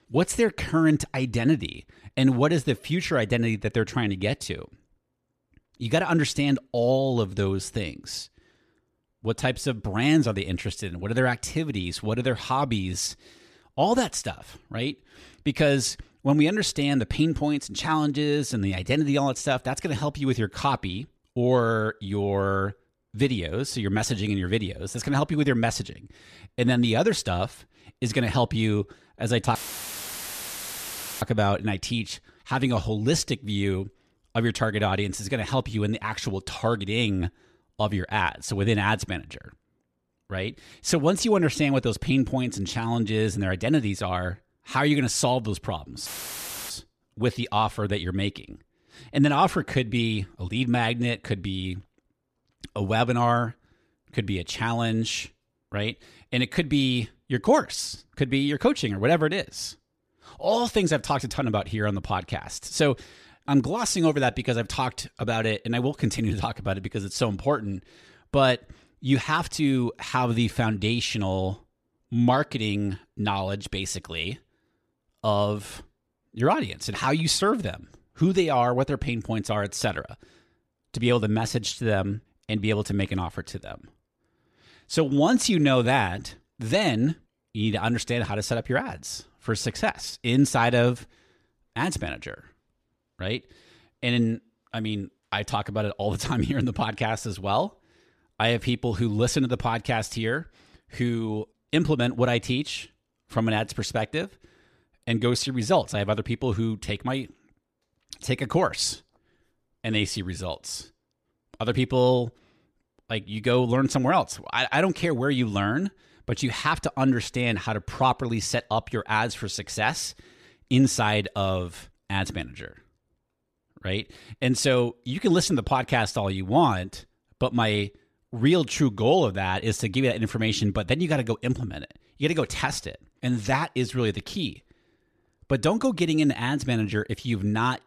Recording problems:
audio cutting out; filled with static; at 30 s for 1.5 s and at 46 s for 0.5 s

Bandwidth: 14 kHz